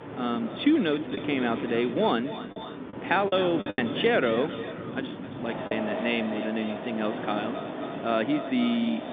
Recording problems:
echo of what is said; noticeable; throughout; 260 ms later, 10 dB below the speech
phone-call audio; nothing above 3.5 kHz
wind in the background; loud; throughout; 8 dB below the speech
choppy; occasionally; from 1 to 4 s and at 5.5 s; 5% of the speech affected

